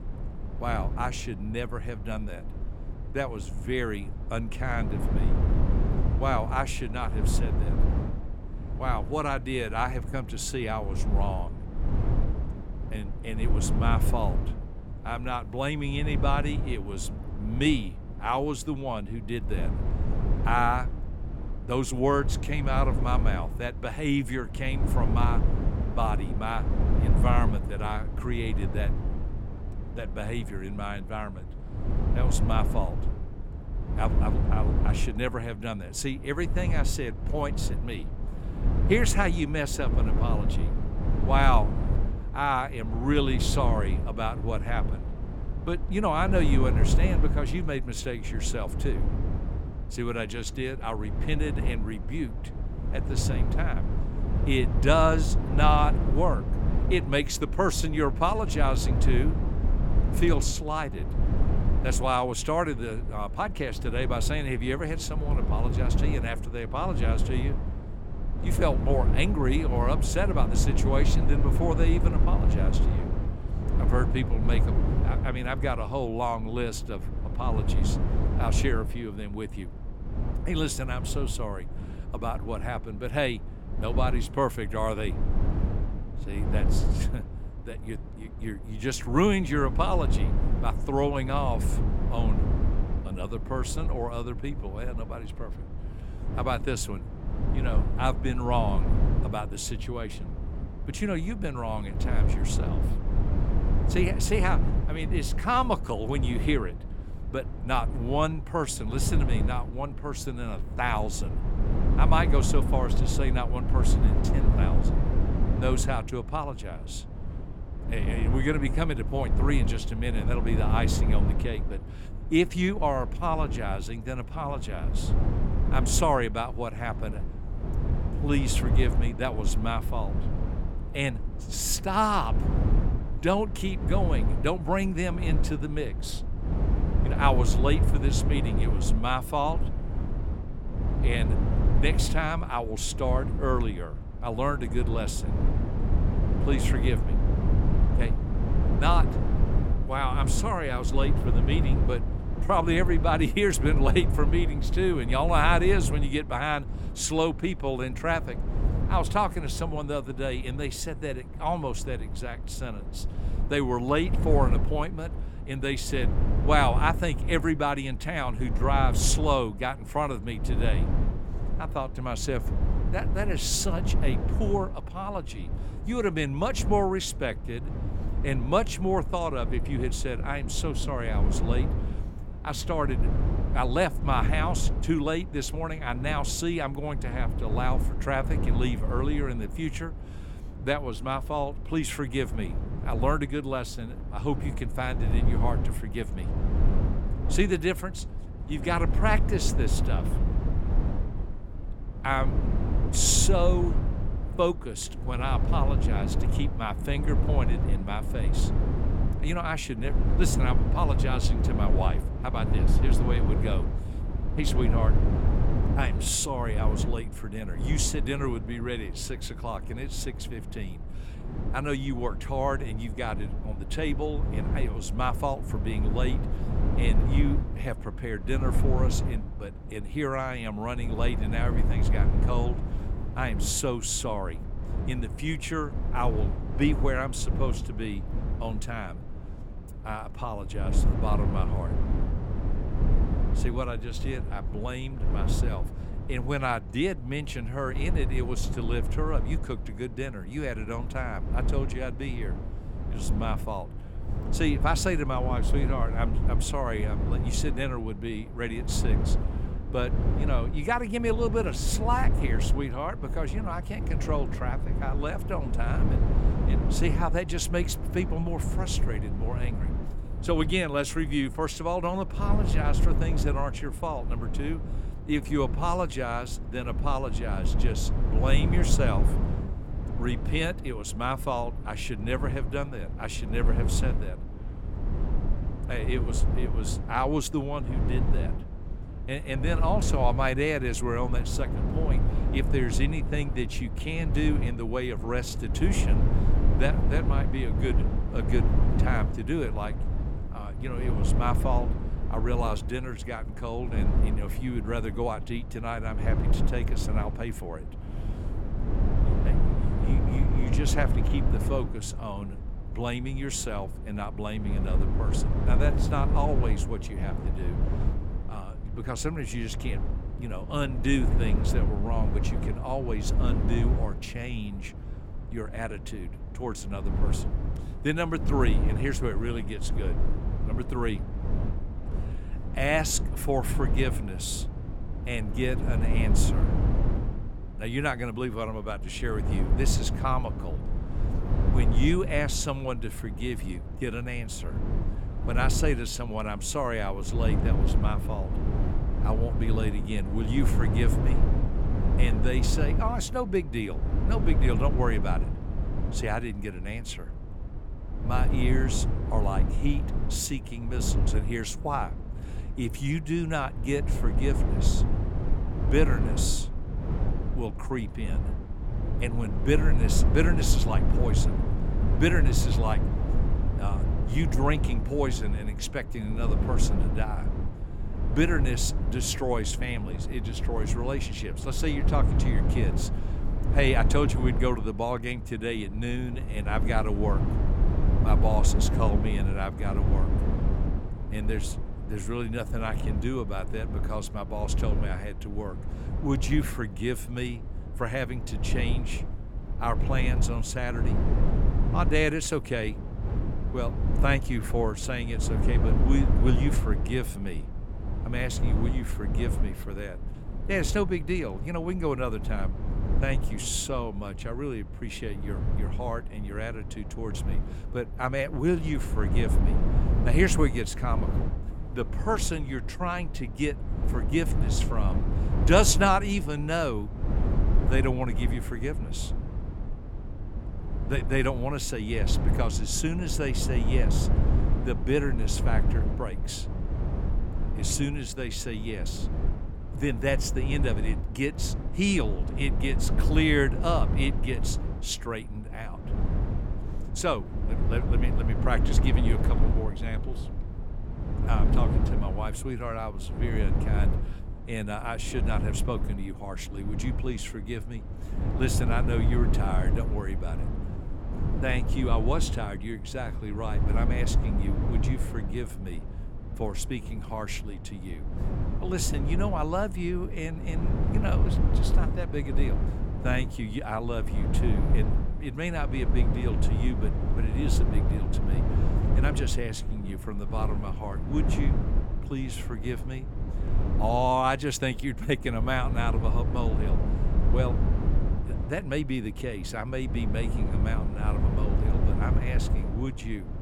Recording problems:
low rumble; loud; throughout; 9 dB below the speech

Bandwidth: 17 kHz